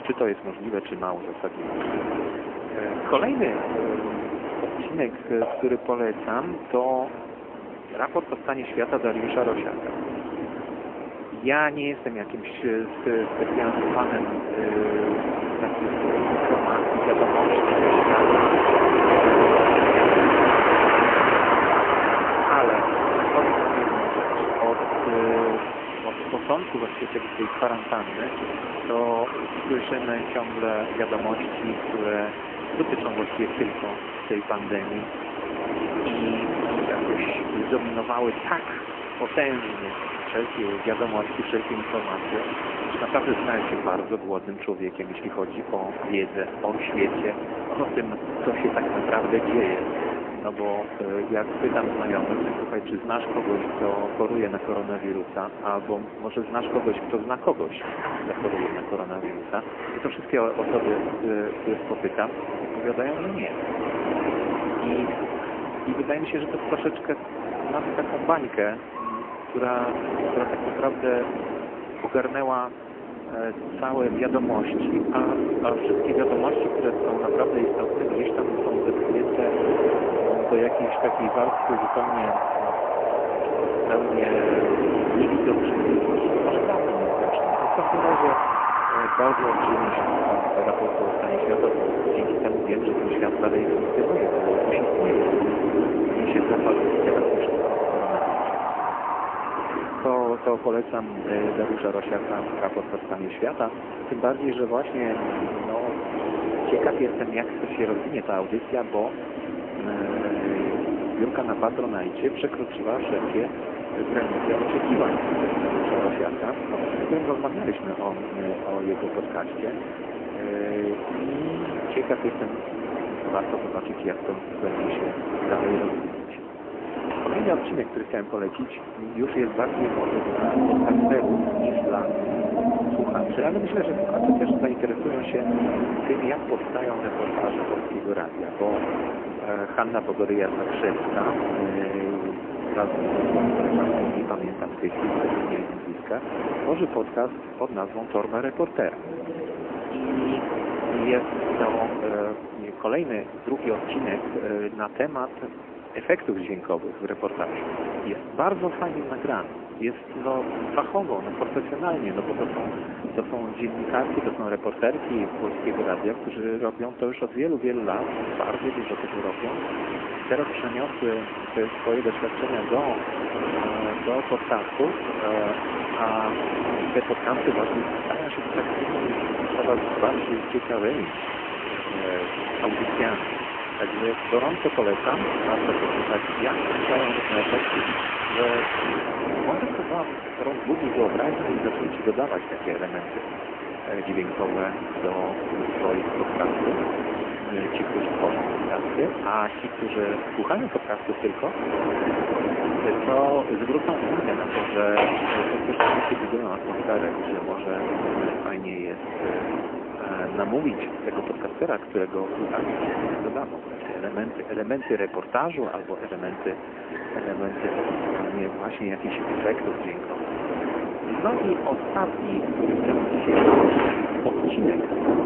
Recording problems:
phone-call audio; poor line
wind in the background; very loud; throughout; 2 dB above the speech

